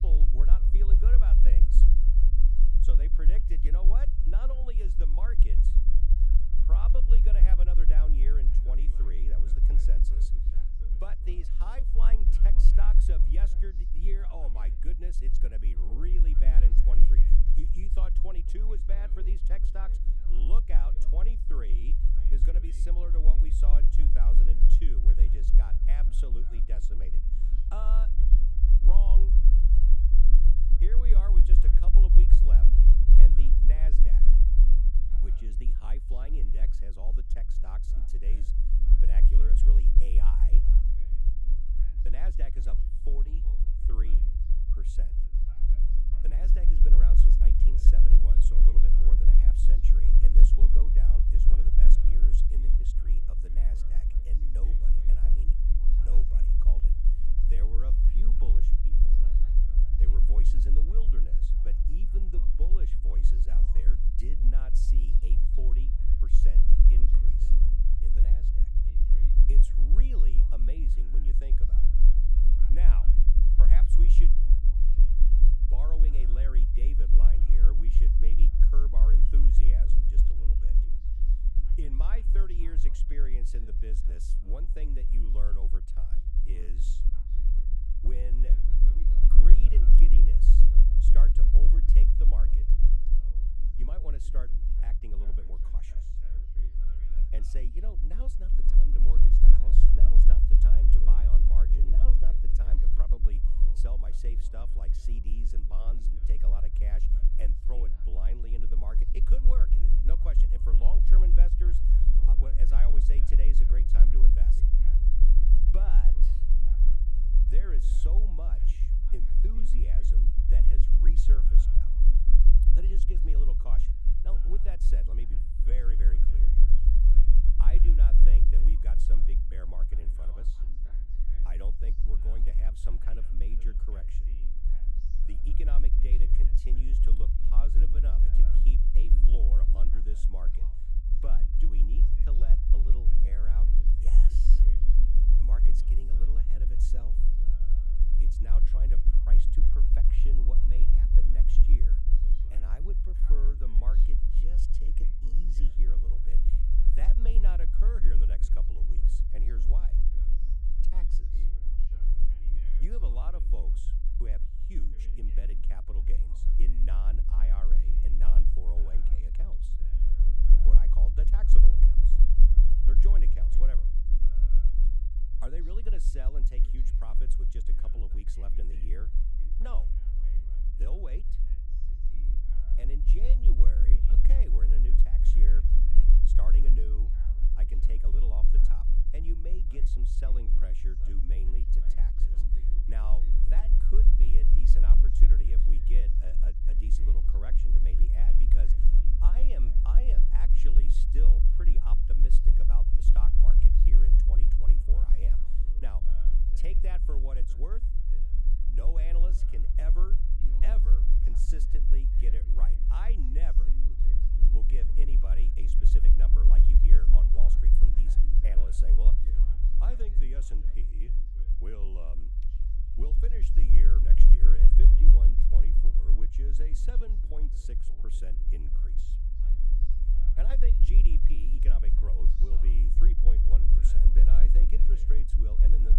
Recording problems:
low rumble; loud; throughout; 2 dB below the speech
voice in the background; noticeable; throughout; 15 dB below the speech

